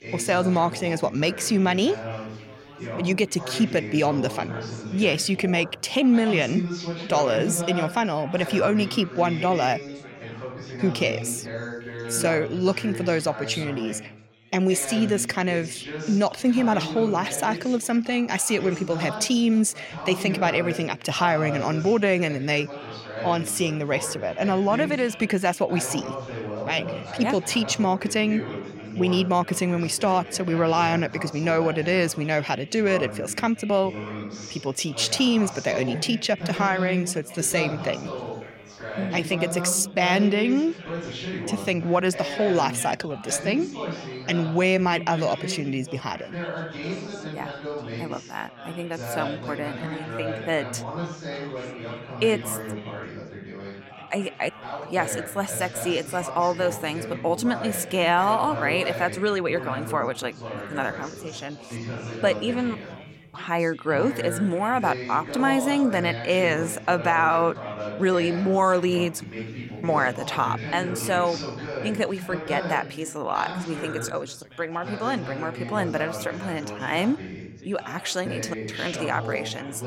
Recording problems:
background chatter; loud; throughout; 4 voices, 10 dB below the speech

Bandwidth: 16 kHz